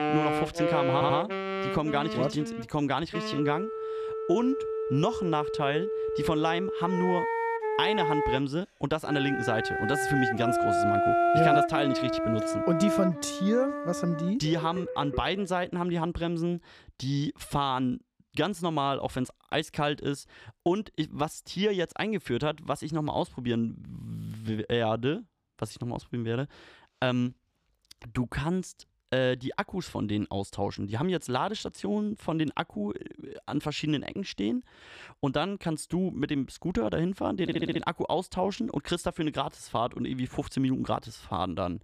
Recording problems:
background music; very loud; until 15 s; 1 dB above the speech
audio stuttering; at 1 s and at 37 s

